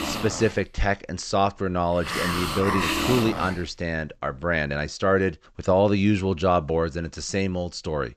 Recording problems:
high frequencies cut off; noticeable; nothing above 8 kHz
hiss; loud; until 4.5 s; 3 dB below the speech

